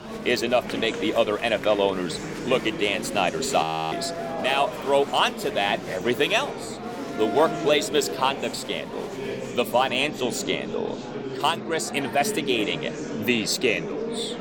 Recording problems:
murmuring crowd; loud; throughout; 8 dB below the speech
audio freezing; at 3.5 s

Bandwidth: 17.5 kHz